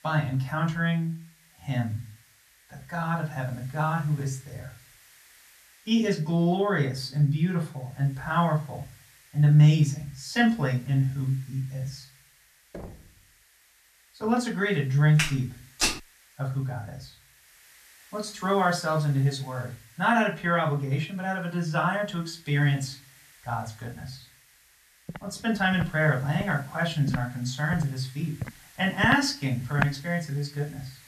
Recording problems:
off-mic speech; far
room echo; very slight; dies away in 0.3 s
hiss; faint; throughout; 25 dB below the speech
door banging; faint; at 13 s; peak 15 dB below the speech
footsteps; loud; at 15 s; peak level with the speech
footsteps; noticeable; from 25 to 30 s; peak 4 dB below the speech

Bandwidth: 14 kHz